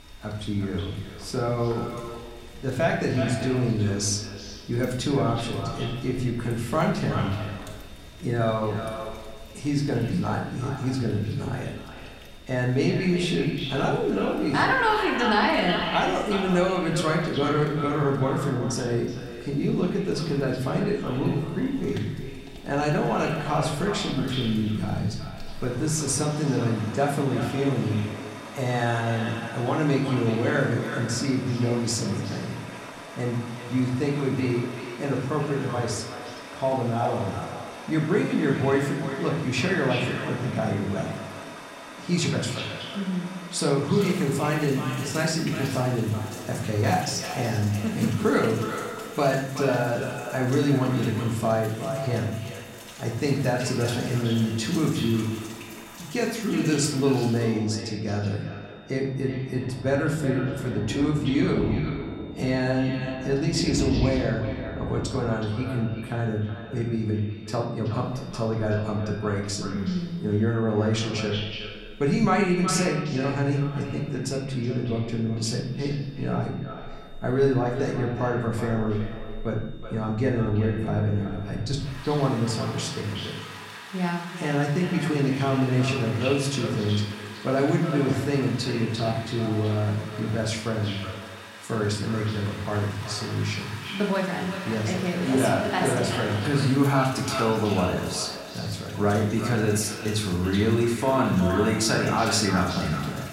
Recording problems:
echo of what is said; strong; throughout; 370 ms later, 10 dB below the speech
room echo; slight; dies away in 0.6 s
off-mic speech; somewhat distant
rain or running water; noticeable; throughout; 15 dB below the speech
high-pitched whine; faint; throughout; 3.5 kHz, 30 dB below the speech

